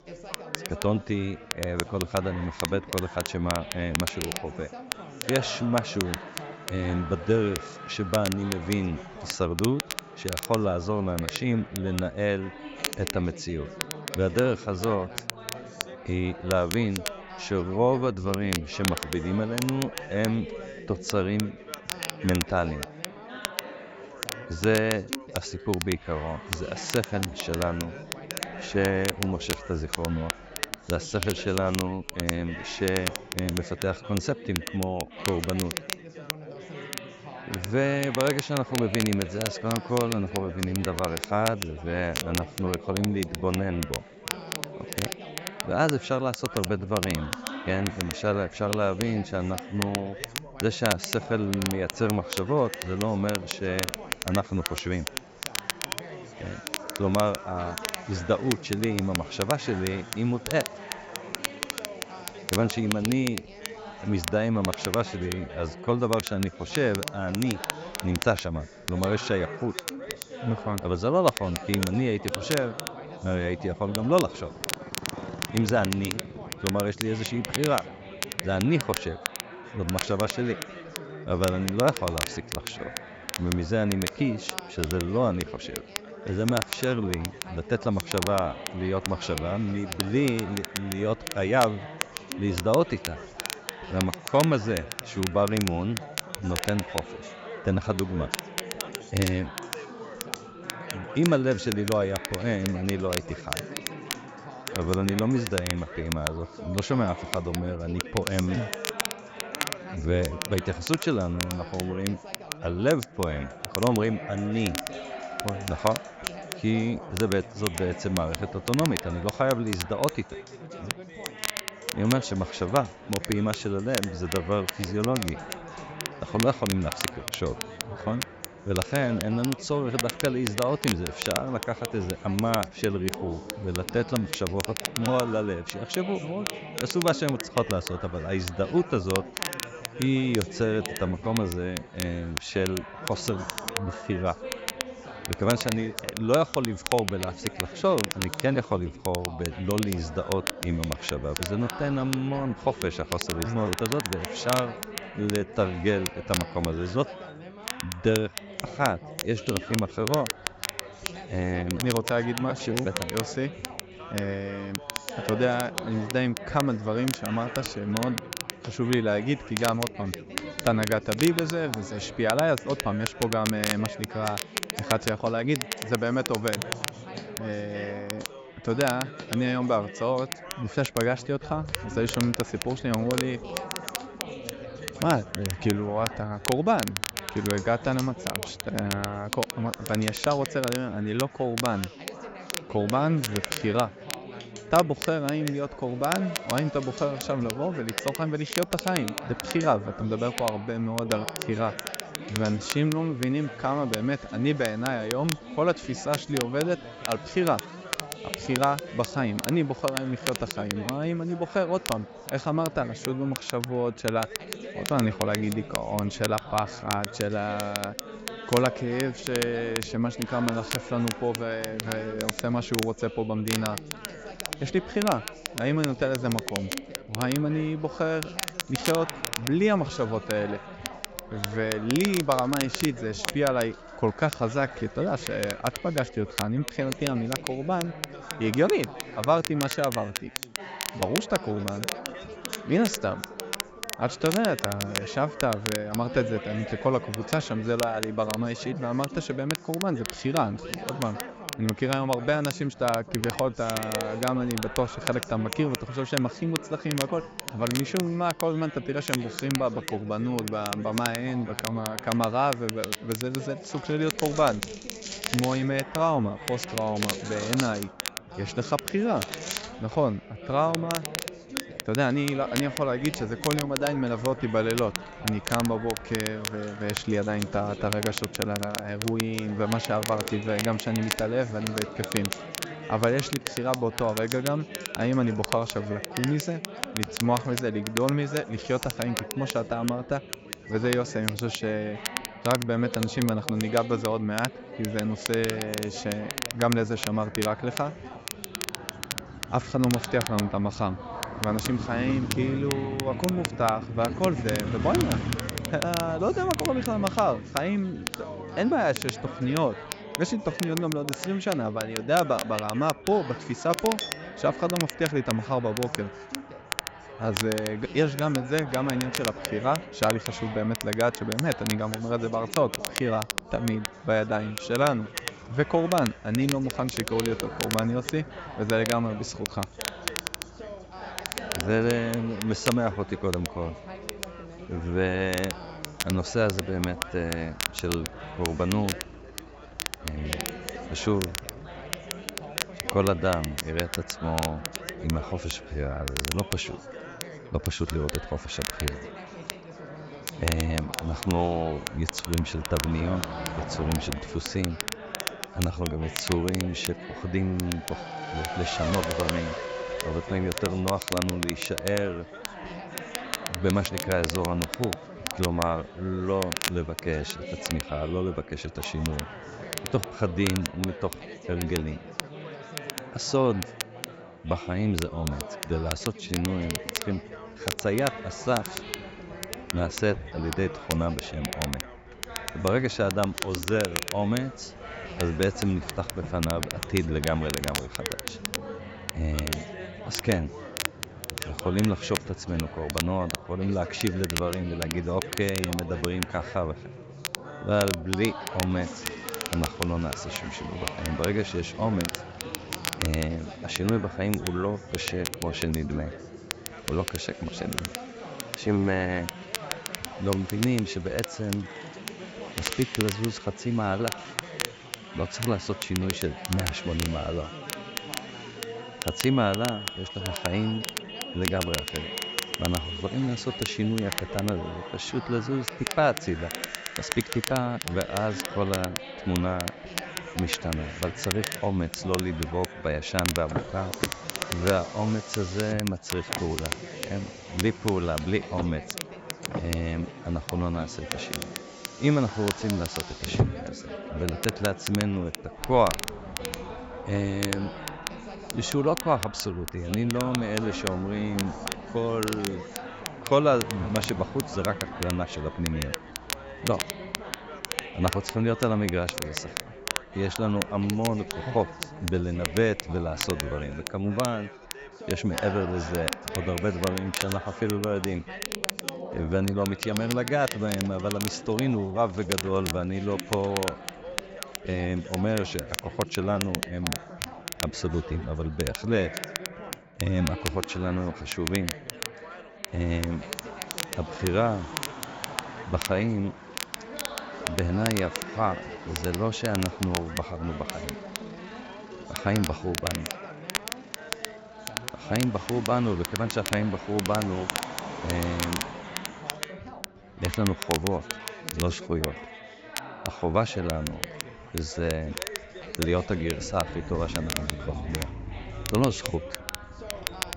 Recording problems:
high frequencies cut off; noticeable; nothing above 8 kHz
crackle, like an old record; loud; 7 dB below the speech
traffic noise; noticeable; throughout; 15 dB below the speech
background chatter; noticeable; throughout; 4 voices, 15 dB below the speech
household noises; faint; throughout; 25 dB below the speech

